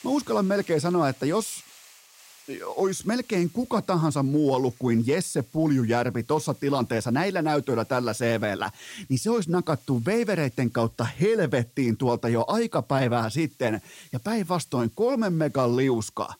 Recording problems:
hiss; faint; throughout; 25 dB below the speech

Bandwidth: 16 kHz